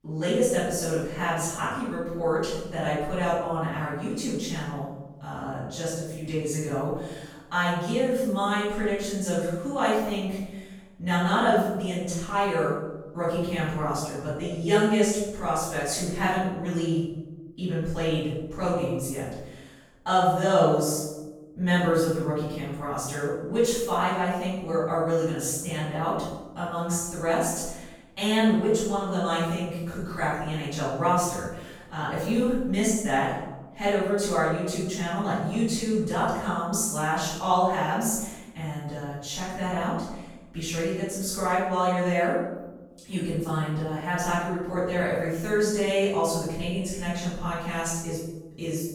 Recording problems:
room echo; strong; dies away in 0.9 s
off-mic speech; far

